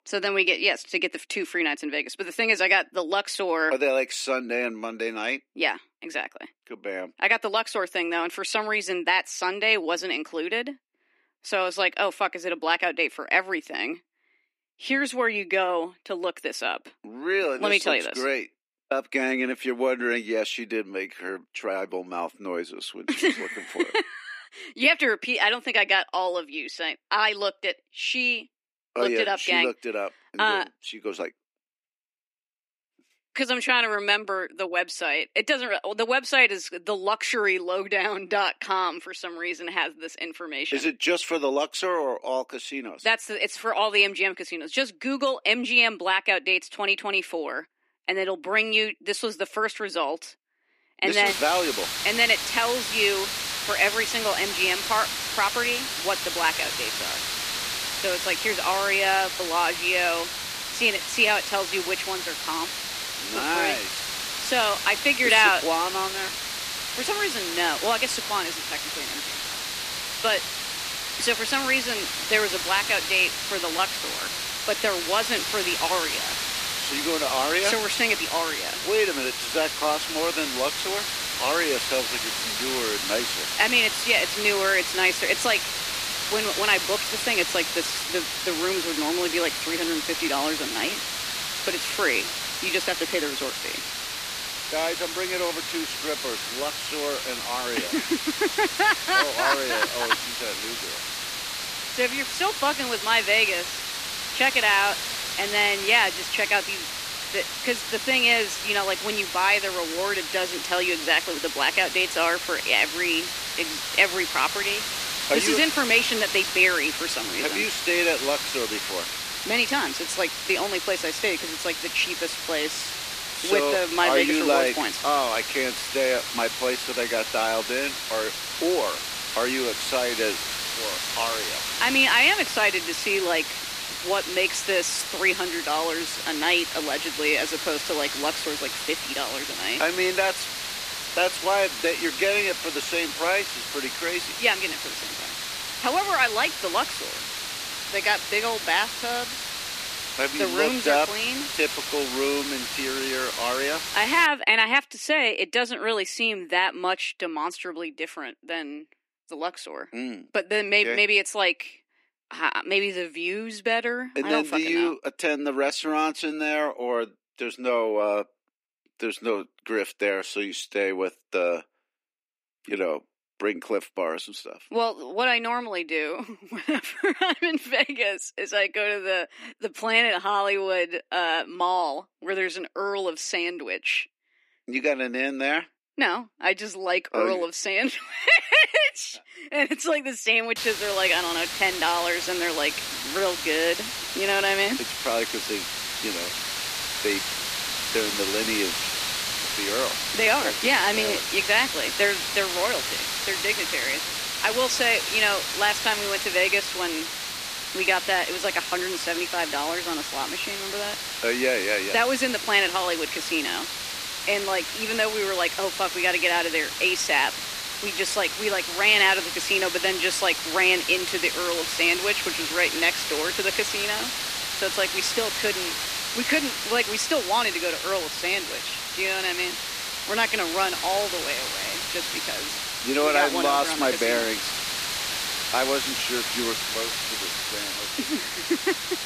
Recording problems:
thin; somewhat; fading below 250 Hz
hiss; loud; from 51 s to 2:34 and from 3:11 on; 4 dB below the speech

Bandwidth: 14.5 kHz